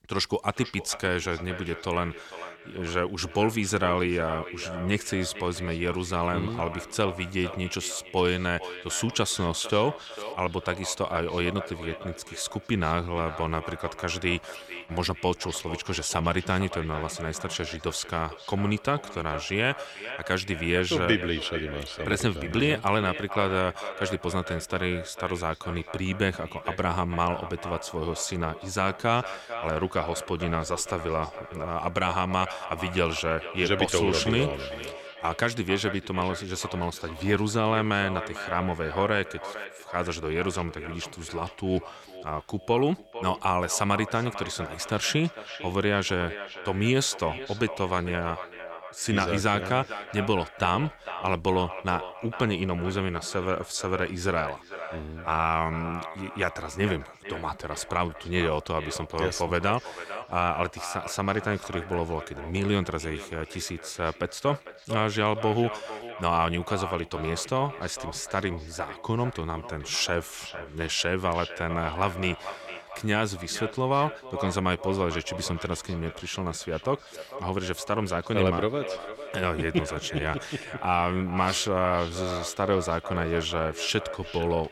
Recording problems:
echo of what is said; strong; throughout; 450 ms later, 10 dB below the speech

